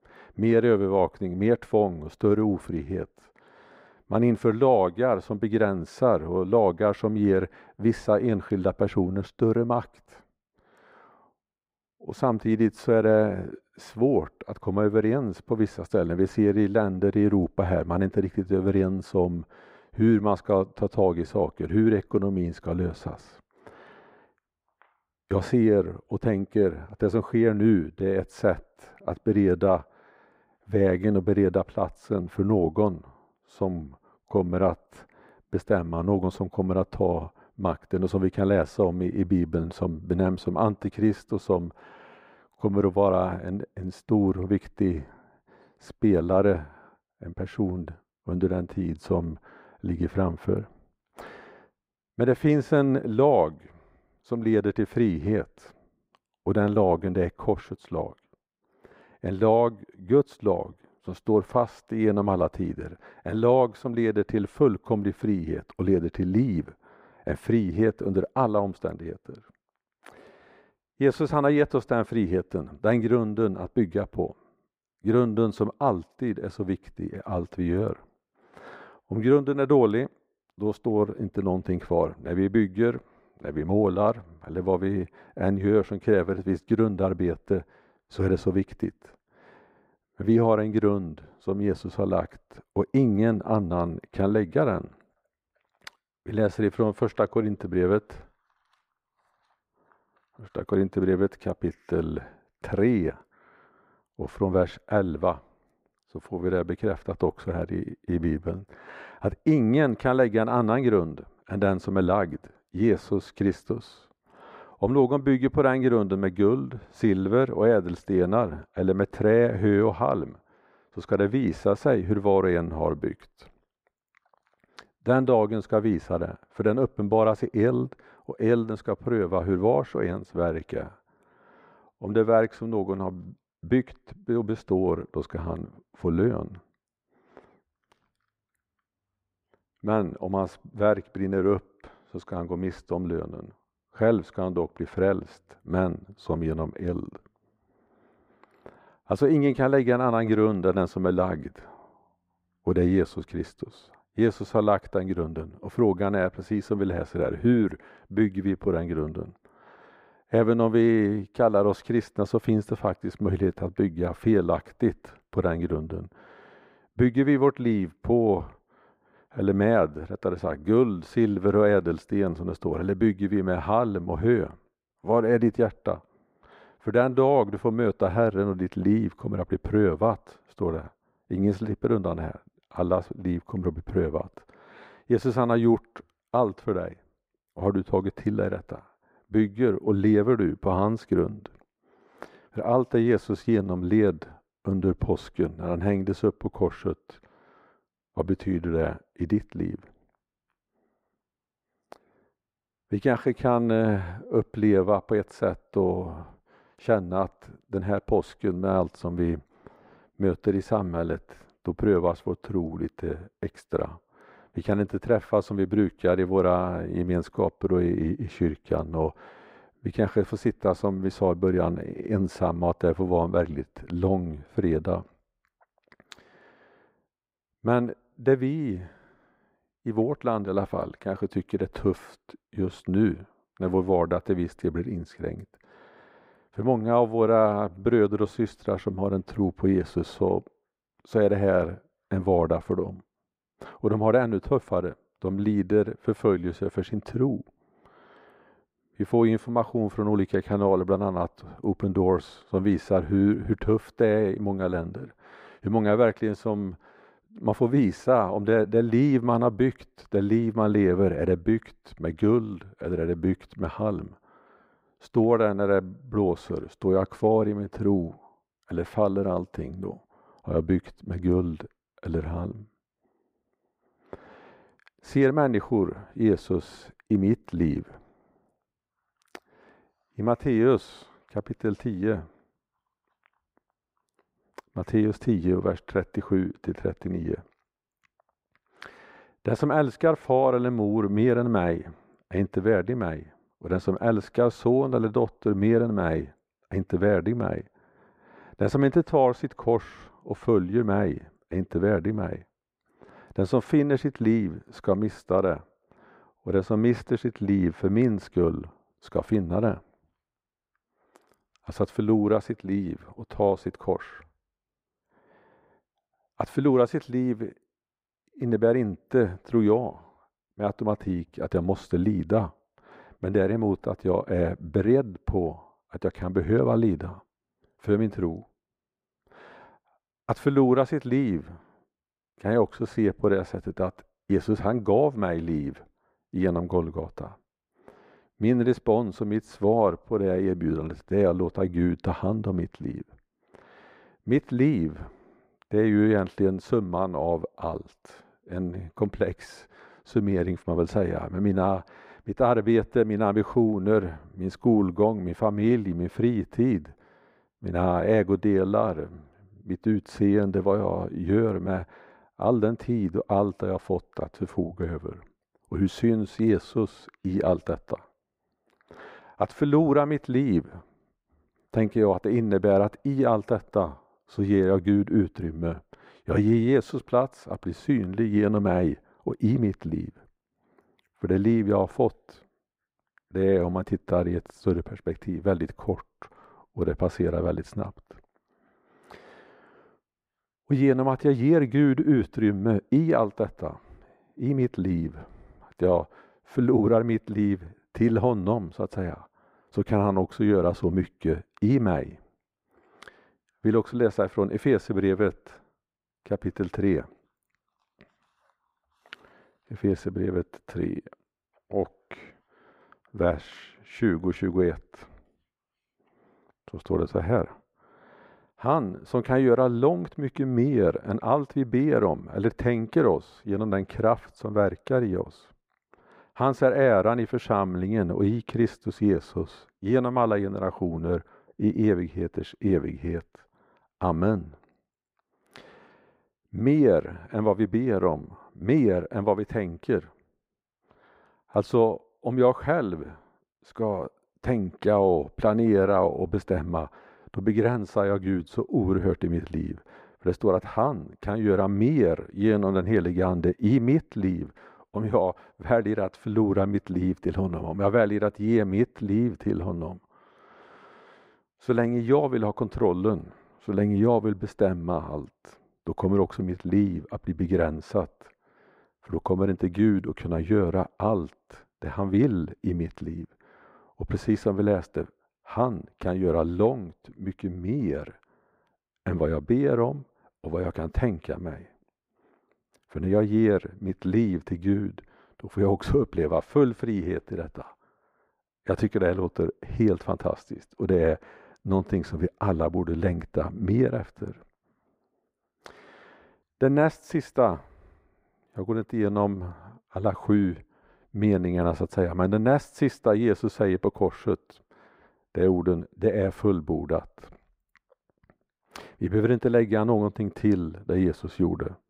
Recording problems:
muffled; very; fading above 2.5 kHz

